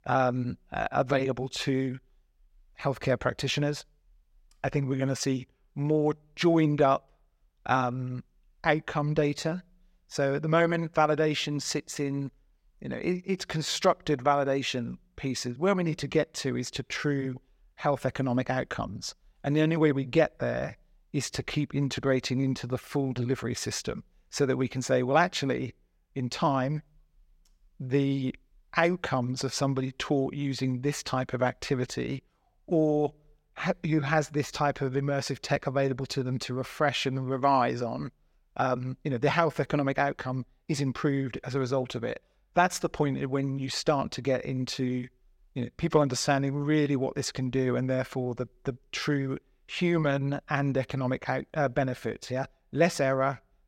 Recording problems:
none

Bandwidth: 16 kHz